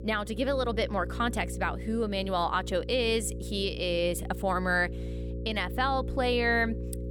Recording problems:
electrical hum; noticeable; throughout; 60 Hz, 15 dB below the speech

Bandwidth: 17.5 kHz